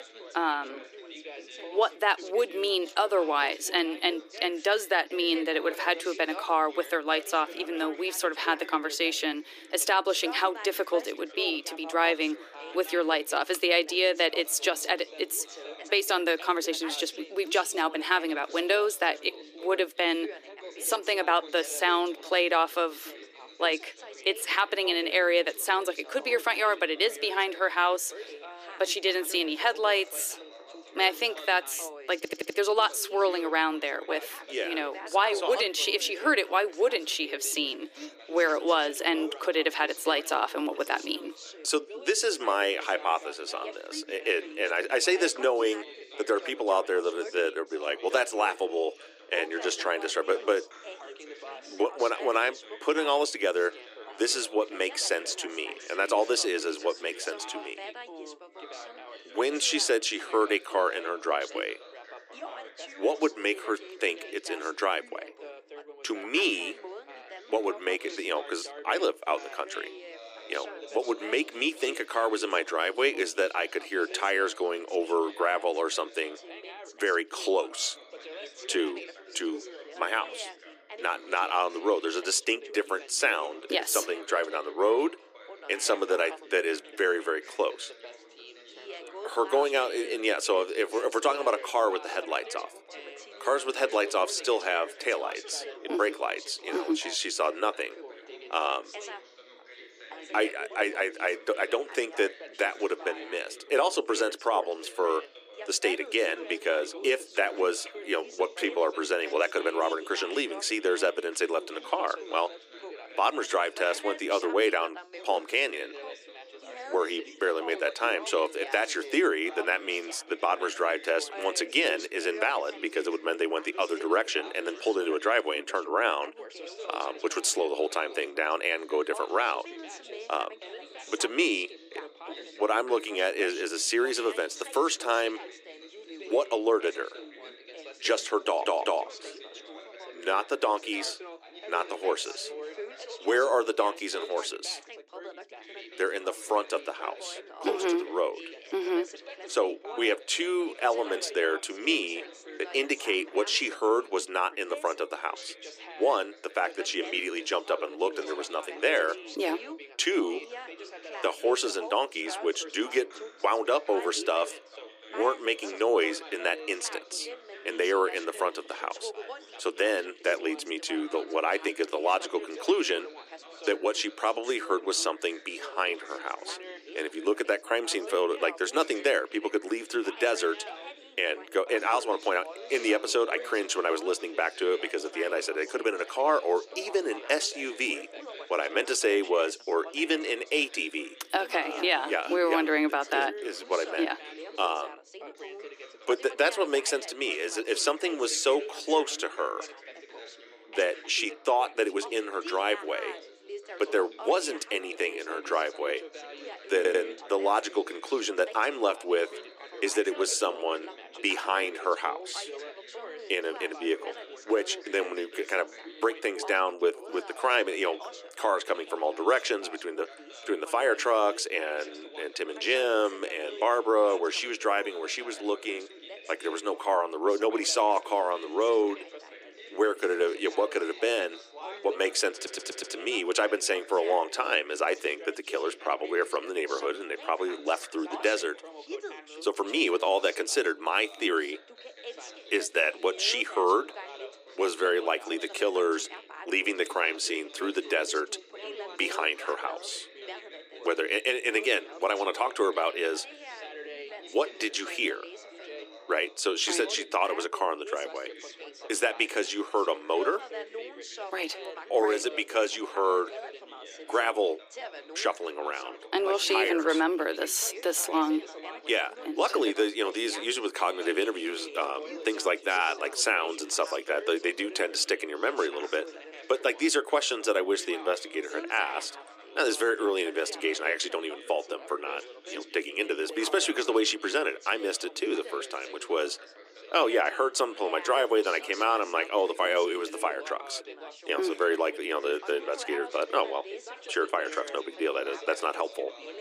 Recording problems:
thin; very; fading below 300 Hz
background chatter; noticeable; throughout; 3 voices, 15 dB below the speech
audio stuttering; 4 times, first at 32 s

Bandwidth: 15 kHz